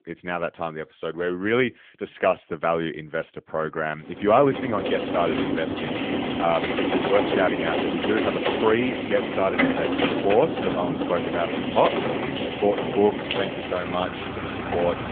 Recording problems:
phone-call audio; nothing above 3.5 kHz
traffic noise; loud; from 4.5 s on; 1 dB below the speech

